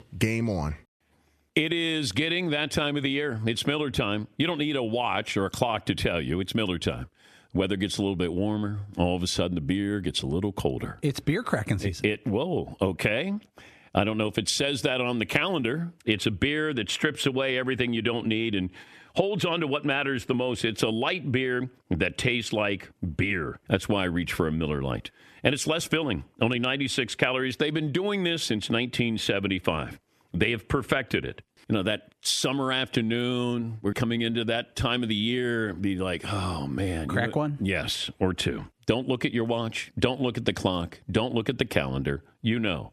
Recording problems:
squashed, flat; somewhat

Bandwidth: 14 kHz